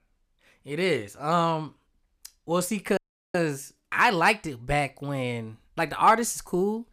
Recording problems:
audio cutting out; at 3 s

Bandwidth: 14.5 kHz